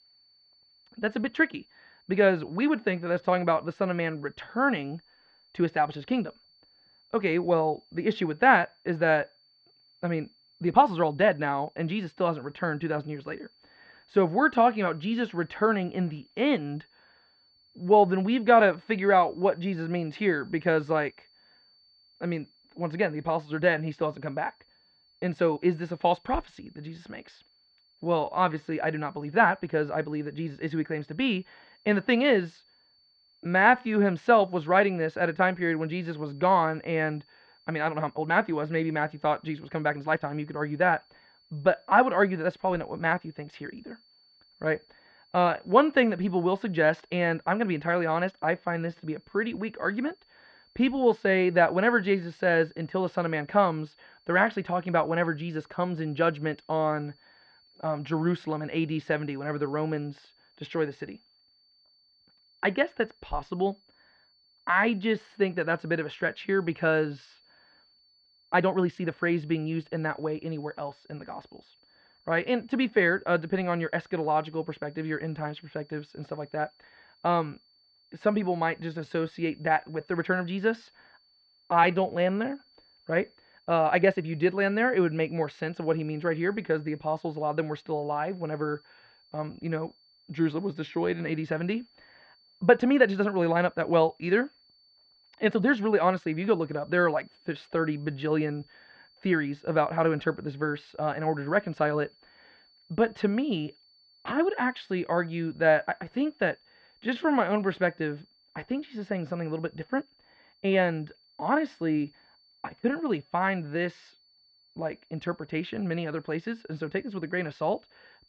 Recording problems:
muffled; very; fading above 3 kHz
high-pitched whine; faint; throughout; 4.5 kHz, 35 dB below the speech
uneven, jittery; strongly; from 1.5 s to 1:51

